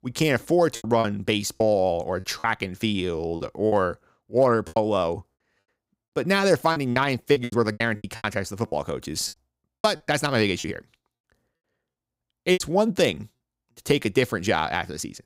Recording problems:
choppy; very; 10% of the speech affected

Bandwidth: 15.5 kHz